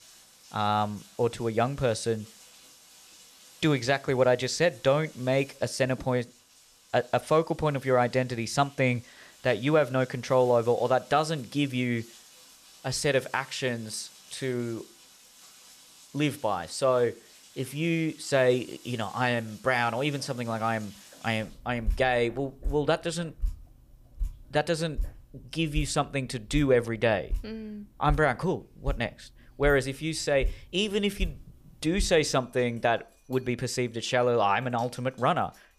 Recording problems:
rain or running water; noticeable; throughout; 15 dB below the speech

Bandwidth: 15 kHz